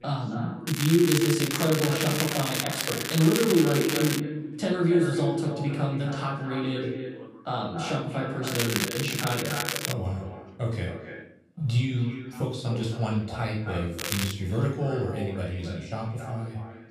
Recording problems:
echo of what is said; strong; throughout; 270 ms later, 8 dB below the speech
off-mic speech; far
room echo; noticeable; dies away in 0.5 s
crackling; loud; from 0.5 to 4 s, from 8.5 to 10 s and at 14 s; 2 dB below the speech
voice in the background; faint; throughout; 25 dB below the speech

